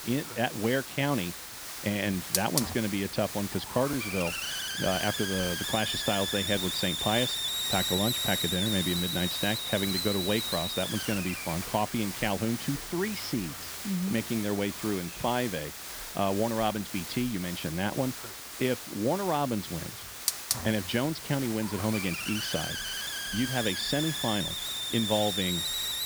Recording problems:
high frequencies cut off; noticeable; nothing above 5.5 kHz
hiss; loud; throughout; 1 dB below the speech

